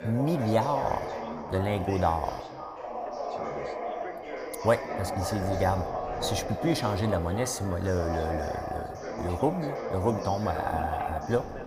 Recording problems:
echo of what is said; noticeable; throughout; 260 ms later, 15 dB below the speech
background chatter; loud; throughout; 4 voices, 5 dB below the speech
wind noise on the microphone; occasional gusts; 15 dB below the speech

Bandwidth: 15 kHz